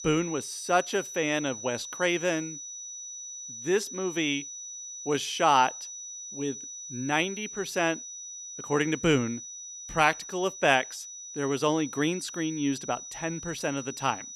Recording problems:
high-pitched whine; loud; throughout; 6 kHz, 10 dB below the speech

